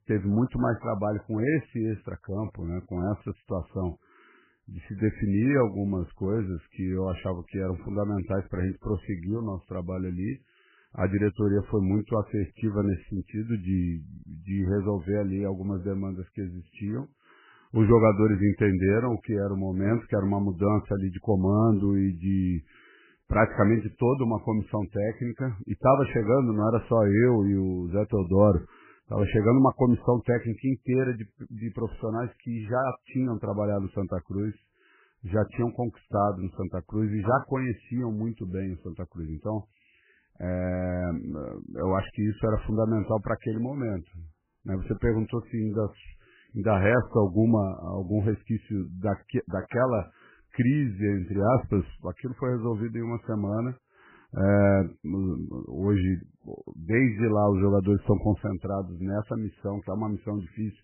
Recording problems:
garbled, watery; badly; nothing above 2.5 kHz

